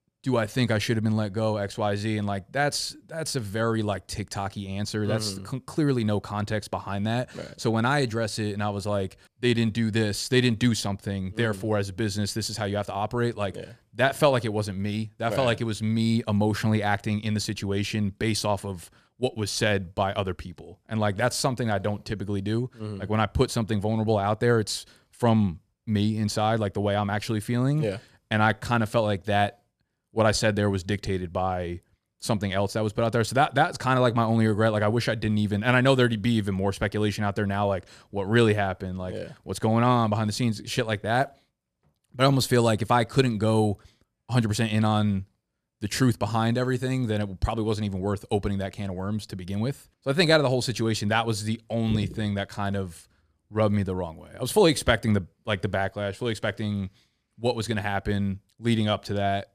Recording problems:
none

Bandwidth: 14.5 kHz